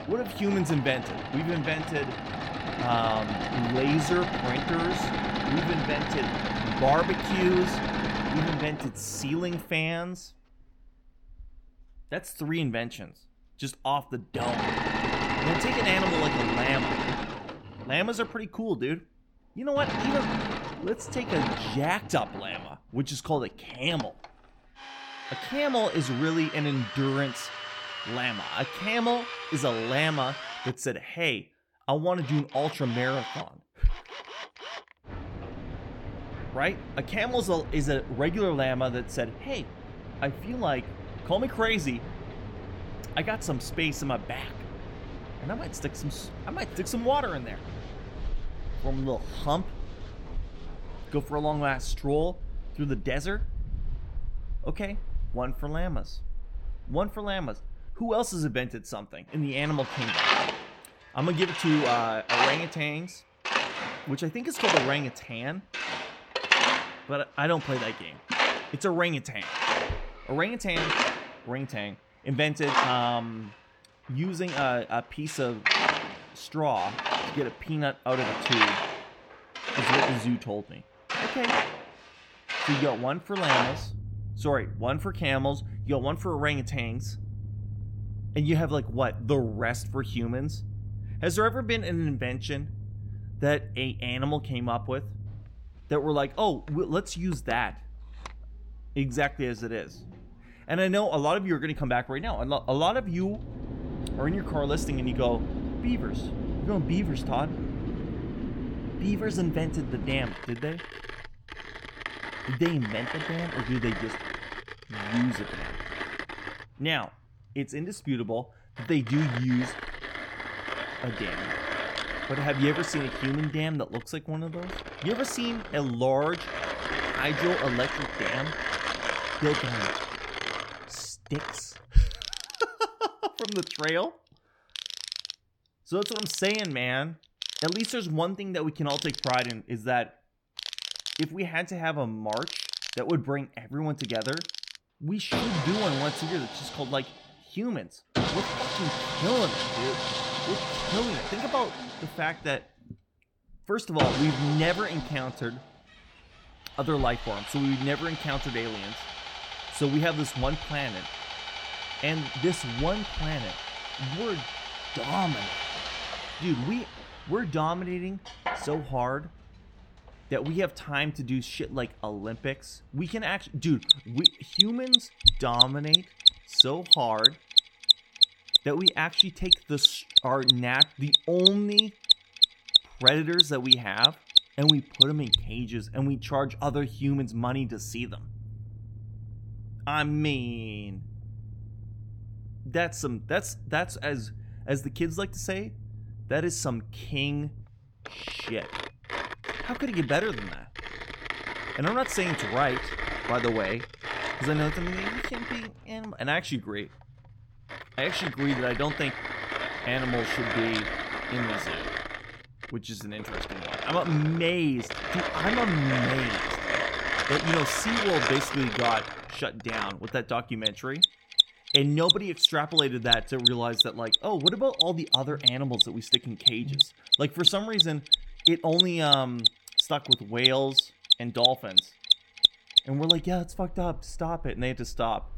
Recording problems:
machinery noise; very loud; throughout; 2 dB above the speech

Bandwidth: 17 kHz